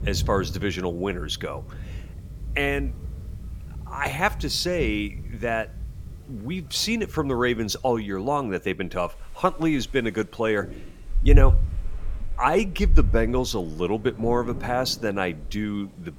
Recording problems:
rain or running water; loud; throughout; 4 dB below the speech

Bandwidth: 17 kHz